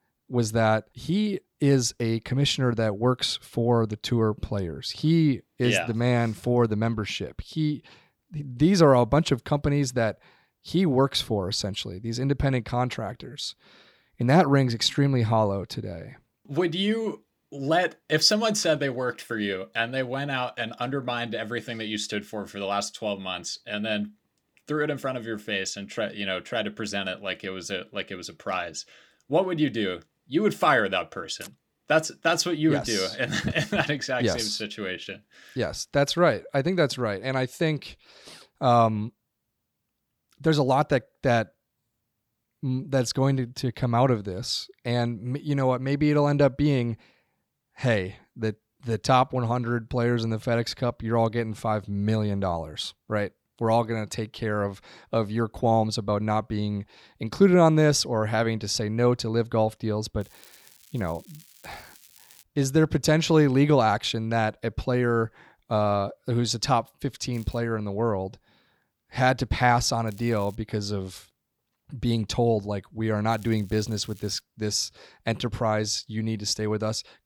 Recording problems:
crackling; faint; 4 times, first at 1:00; 25 dB below the speech

